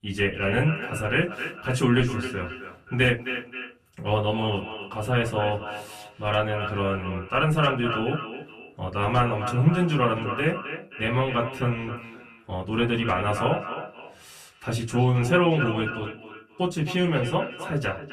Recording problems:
echo of what is said; strong; throughout; 270 ms later, 9 dB below the speech
off-mic speech; far
room echo; very slight; dies away in 0.2 s

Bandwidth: 14 kHz